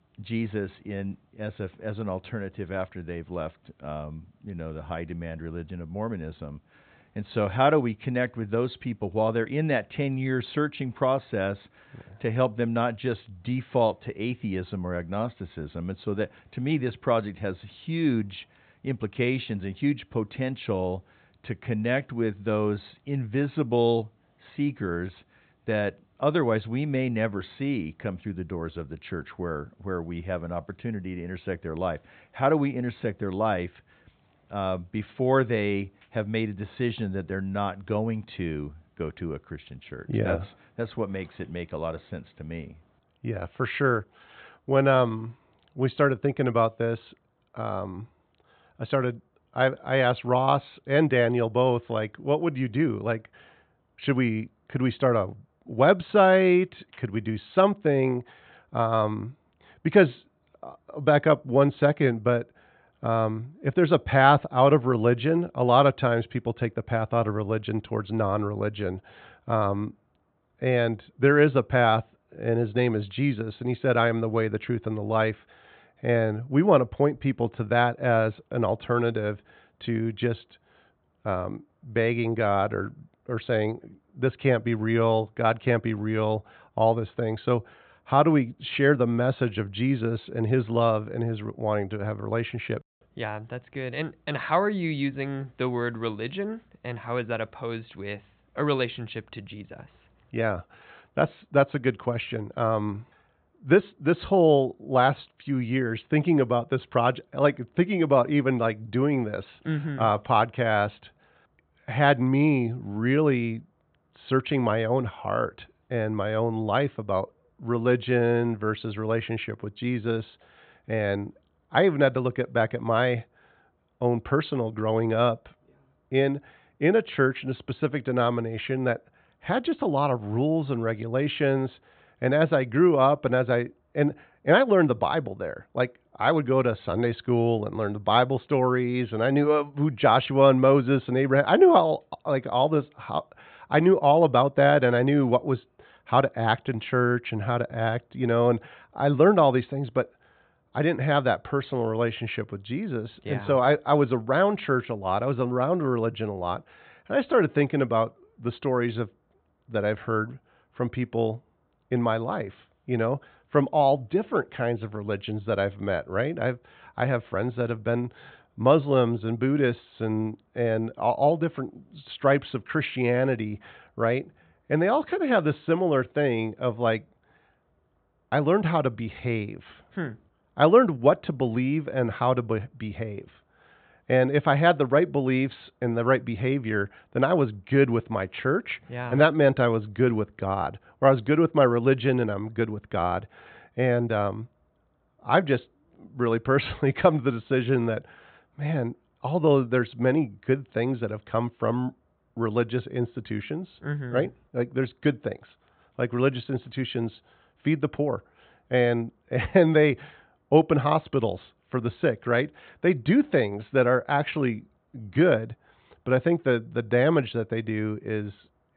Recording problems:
high frequencies cut off; severe; nothing above 4 kHz

